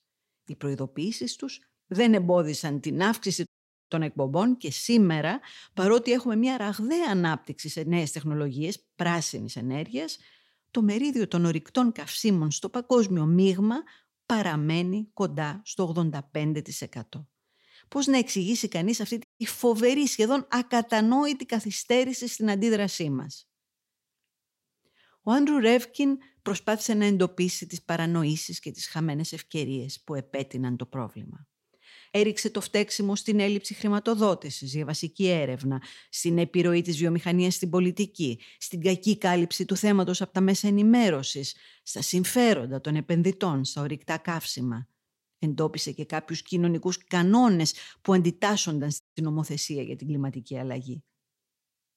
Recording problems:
audio cutting out; at 3.5 s, at 19 s and at 49 s

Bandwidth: 16 kHz